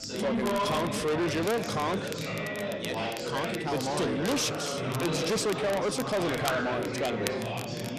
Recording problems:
distortion; heavy; 7 dB below the speech
chatter from many people; loud; throughout; 2 dB below the speech
crackle, like an old record; noticeable; 15 dB below the speech

